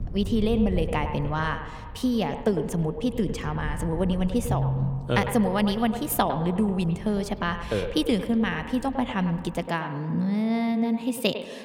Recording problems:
echo of what is said; strong; throughout; 100 ms later, 10 dB below the speech
wind noise on the microphone; occasional gusts; until 9.5 s; 25 dB below the speech

